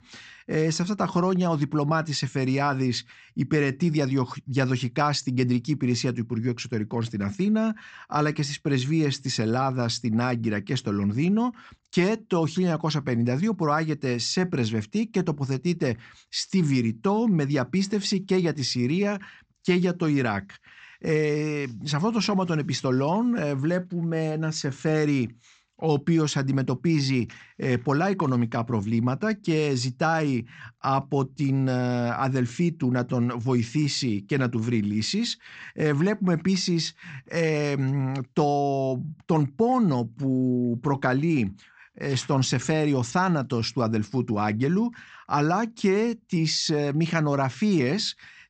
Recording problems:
high frequencies cut off; noticeable; nothing above 8 kHz

